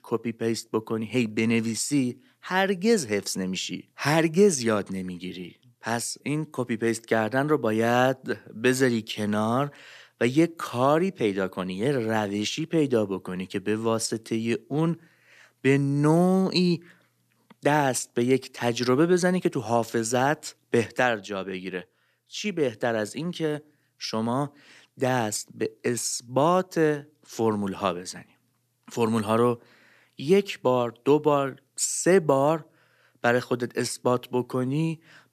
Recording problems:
none

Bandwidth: 14.5 kHz